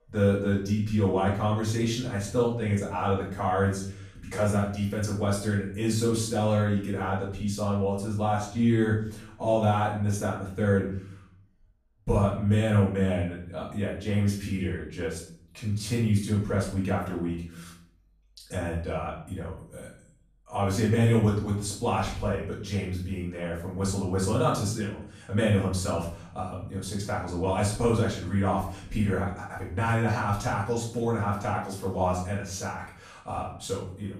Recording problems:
off-mic speech; far
room echo; noticeable; dies away in 0.5 s

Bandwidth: 15 kHz